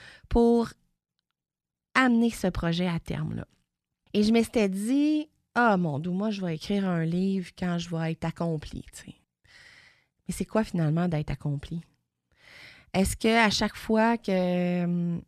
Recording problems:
none

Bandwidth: 14 kHz